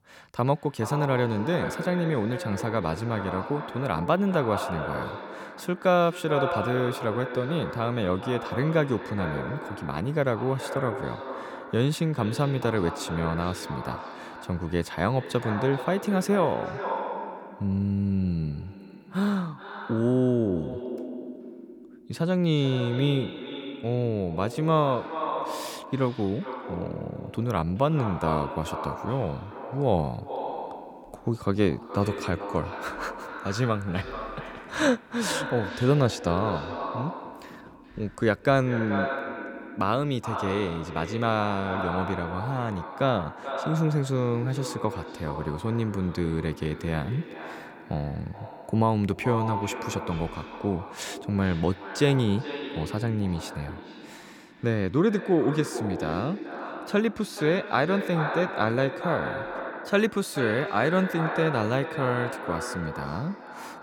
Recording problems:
echo of what is said; strong; throughout; 420 ms later, 8 dB below the speech

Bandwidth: 18 kHz